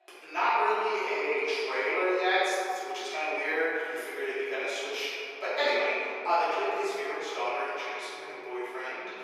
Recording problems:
room echo; strong; dies away in 2.6 s
off-mic speech; far
thin; very; fading below 350 Hz

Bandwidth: 14.5 kHz